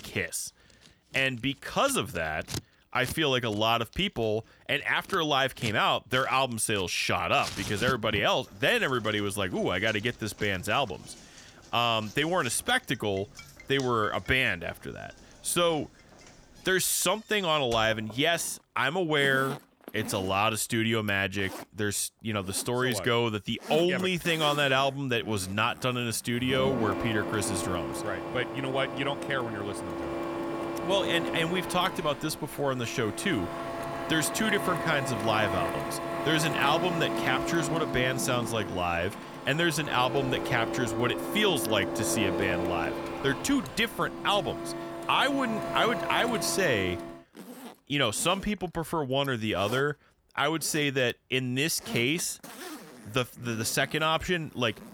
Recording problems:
household noises; loud; throughout; 8 dB below the speech

